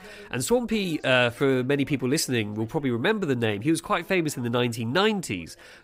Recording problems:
background chatter; faint; throughout; 3 voices, 30 dB below the speech

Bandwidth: 15.5 kHz